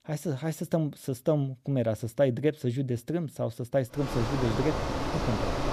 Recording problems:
traffic noise; loud; from 4 s on; 2 dB below the speech

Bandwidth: 14.5 kHz